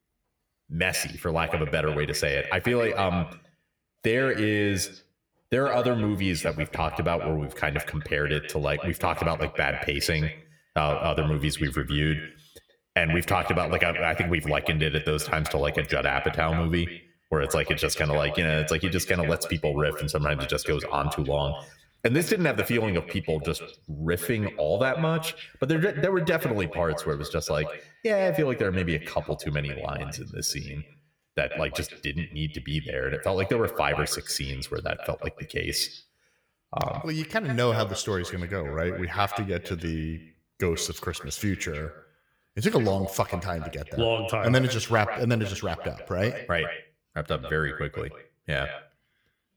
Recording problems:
echo of what is said; strong; throughout; 130 ms later, 10 dB below the speech

